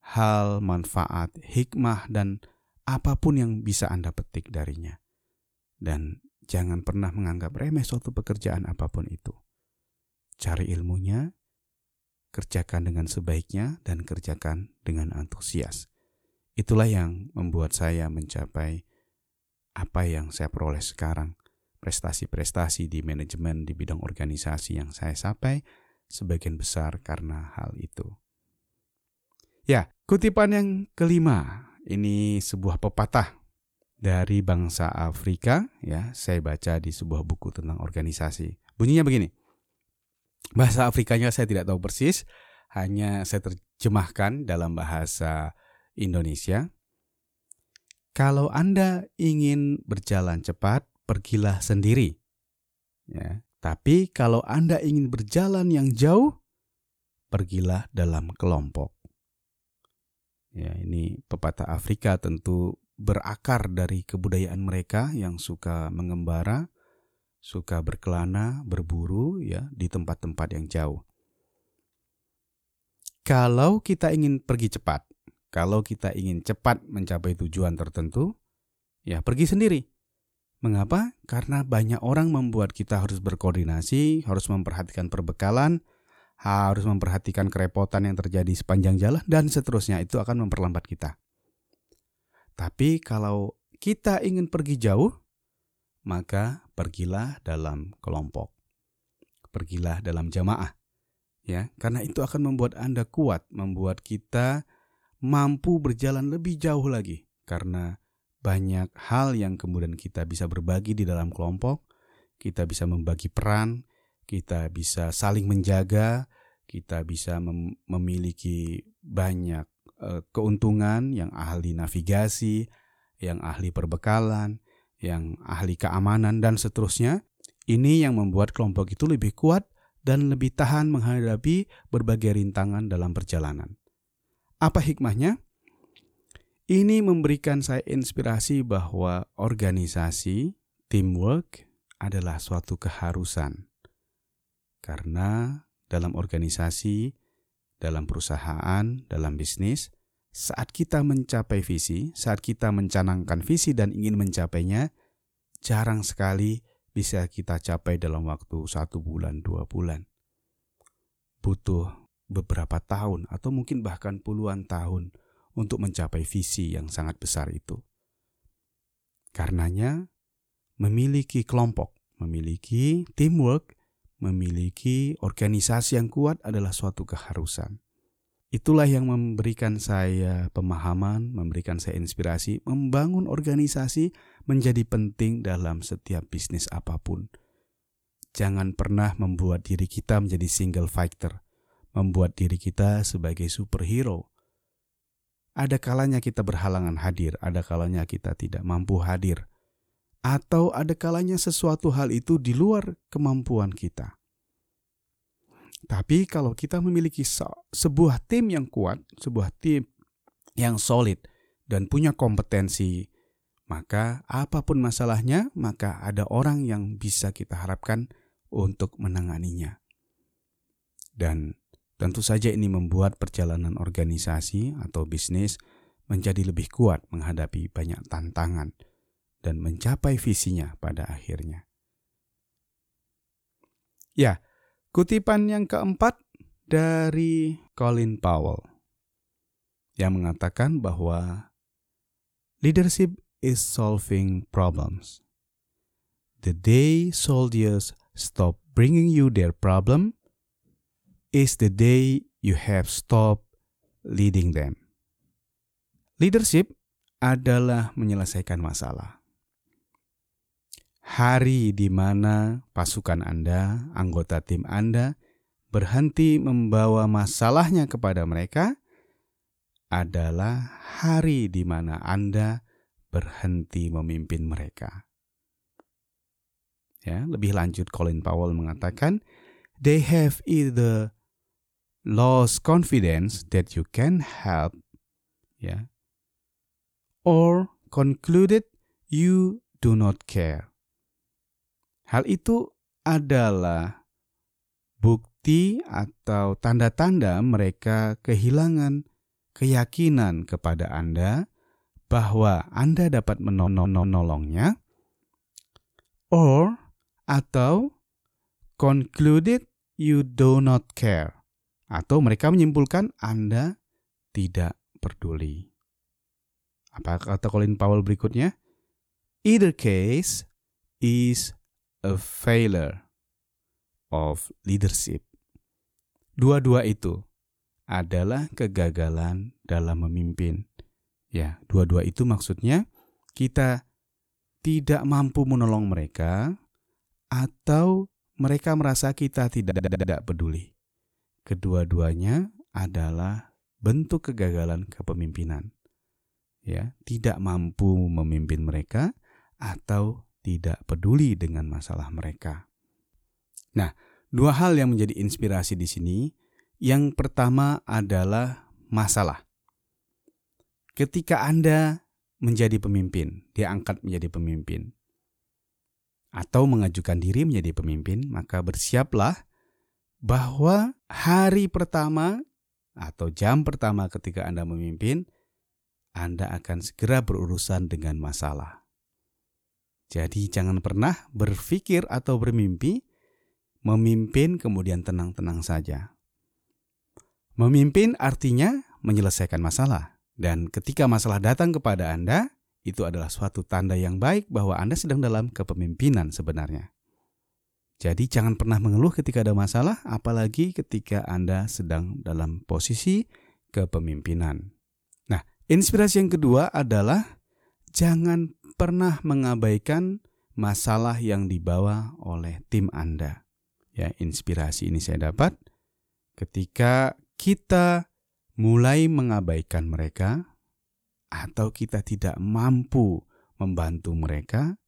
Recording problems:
audio stuttering; at 5:03 and at 5:40

